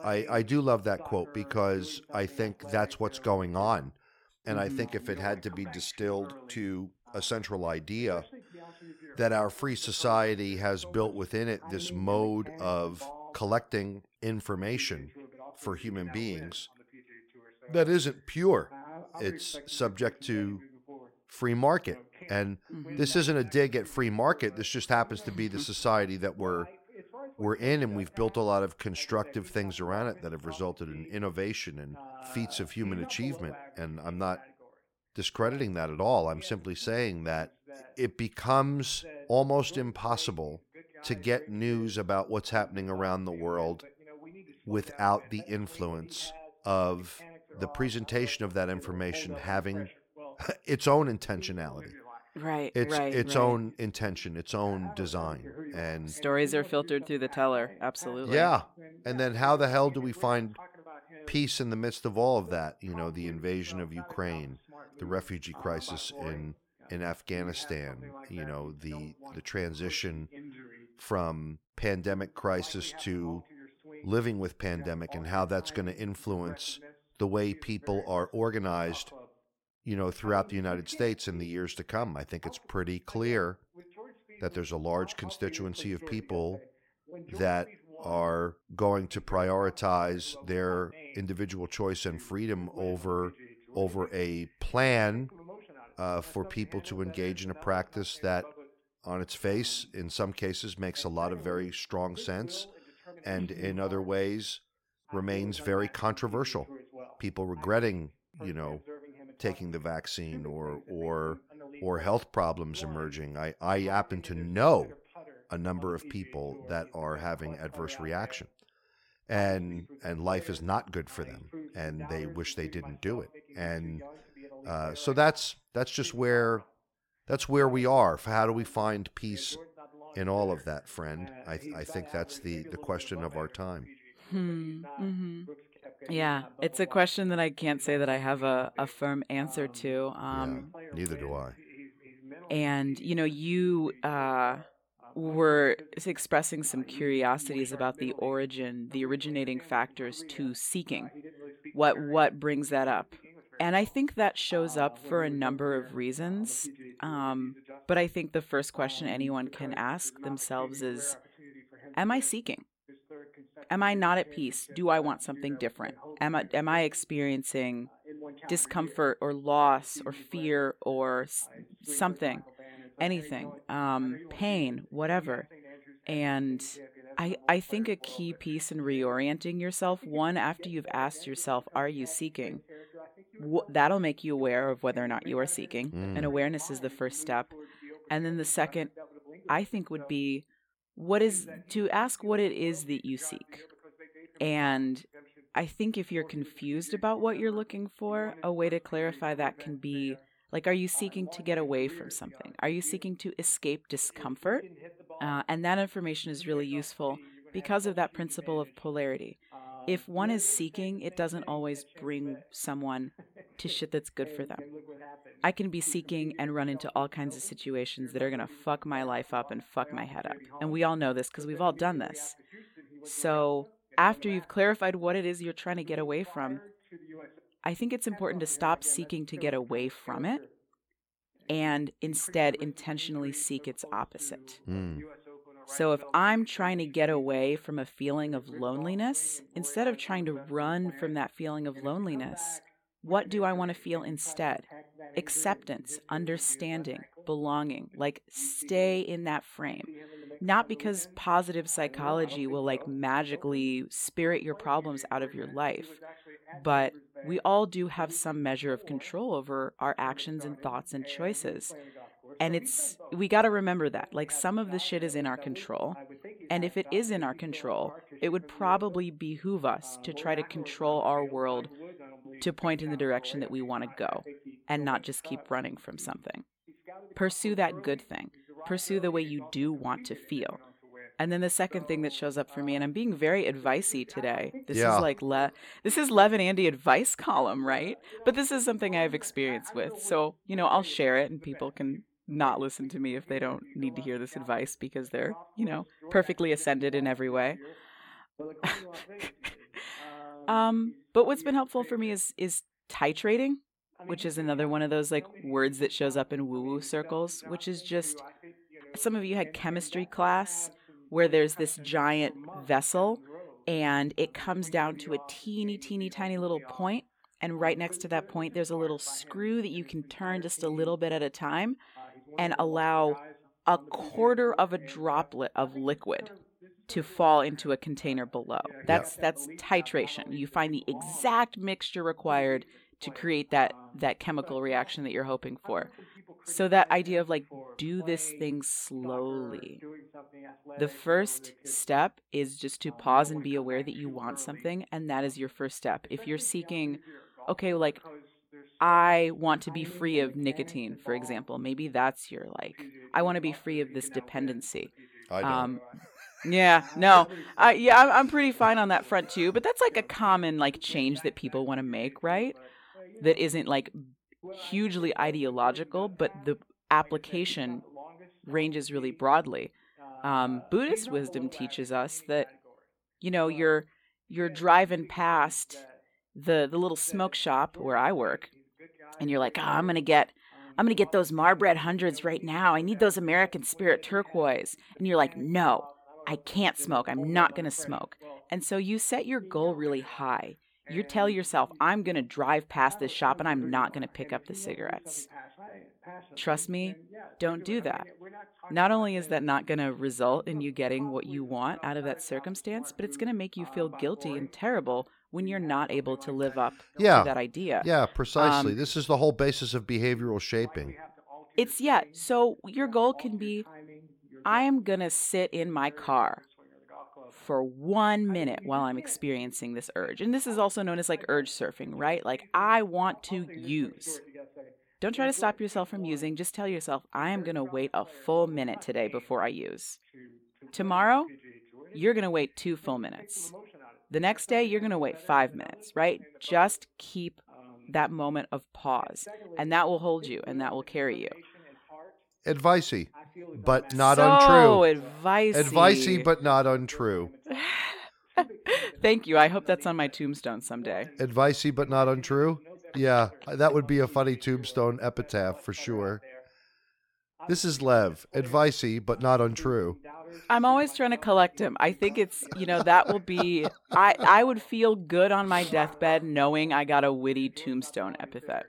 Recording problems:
voice in the background; faint; throughout; 20 dB below the speech

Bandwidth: 18.5 kHz